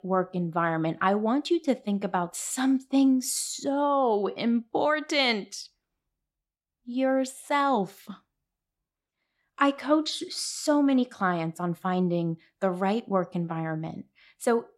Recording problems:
none

